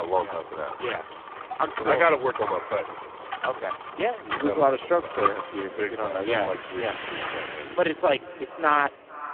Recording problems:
phone-call audio; poor line
echo of what is said; noticeable; throughout; 450 ms later, 20 dB below the speech
traffic noise; loud; throughout; 10 dB below the speech
abrupt cut into speech; at the start

